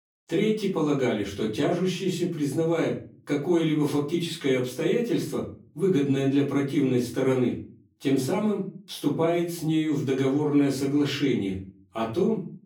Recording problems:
off-mic speech; far
room echo; slight; dies away in 0.4 s

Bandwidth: 18.5 kHz